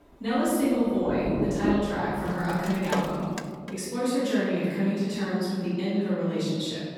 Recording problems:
room echo; strong; dies away in 1.9 s
off-mic speech; far
rain or running water; very faint; until 3 s; 6 dB below the speech

